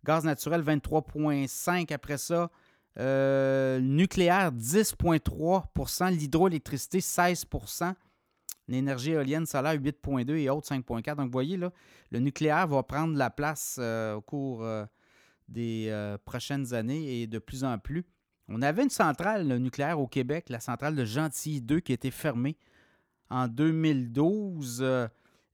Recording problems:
none

